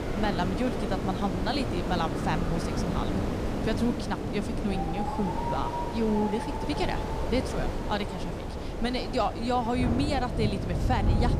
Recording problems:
wind noise on the microphone; heavy; 5 dB below the speech
wind in the background; loud; throughout; 3 dB below the speech

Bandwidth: 15 kHz